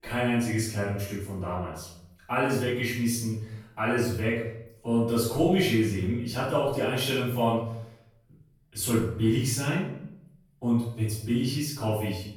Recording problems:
off-mic speech; far
room echo; noticeable; dies away in 0.6 s

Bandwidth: 18 kHz